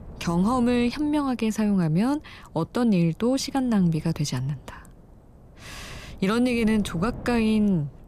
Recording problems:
wind noise on the microphone; occasional gusts; 20 dB below the speech

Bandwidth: 14.5 kHz